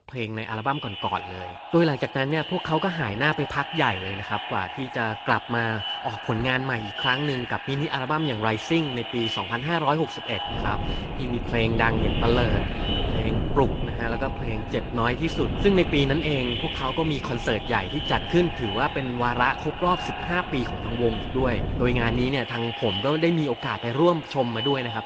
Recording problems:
echo of what is said; strong; throughout; 160 ms later, 7 dB below the speech
garbled, watery; slightly
wind noise on the microphone; occasional gusts; from 11 to 22 s; 10 dB below the speech

